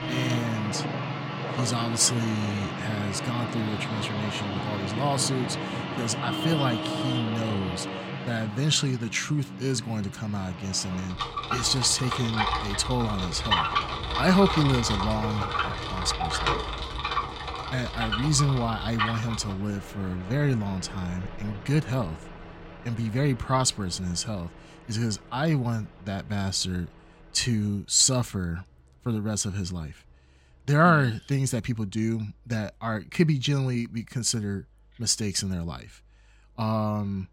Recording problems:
traffic noise; loud; throughout; 4 dB below the speech

